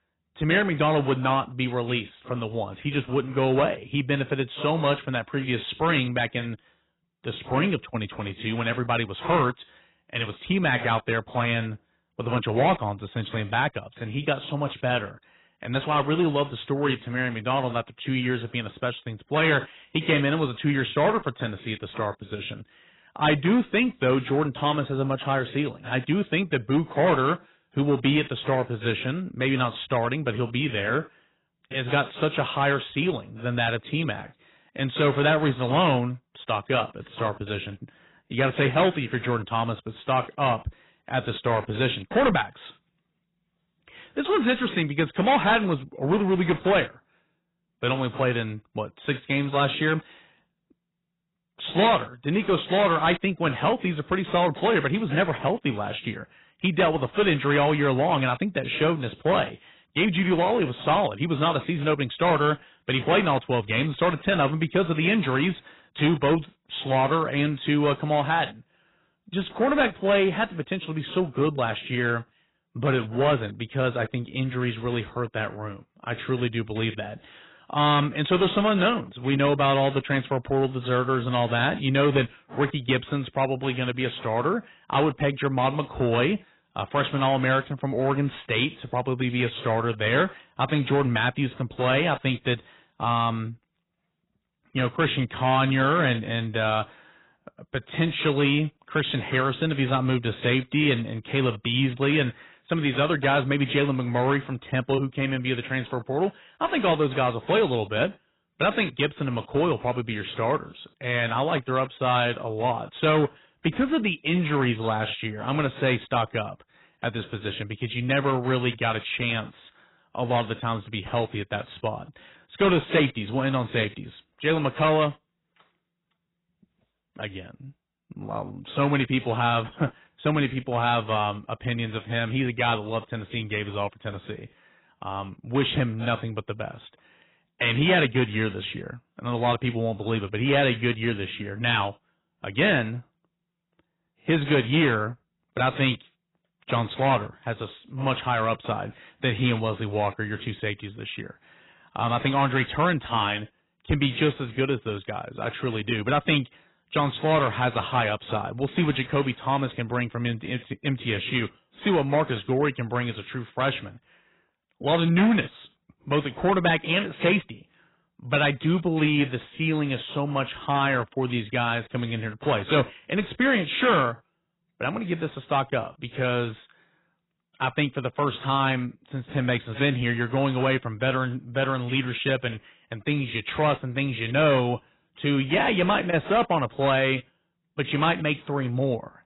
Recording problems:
garbled, watery; badly; nothing above 4 kHz
distortion; slight; 5% of the sound clipped

